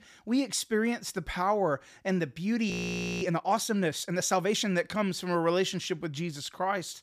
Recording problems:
audio freezing; at 2.5 s for 0.5 s

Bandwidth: 15 kHz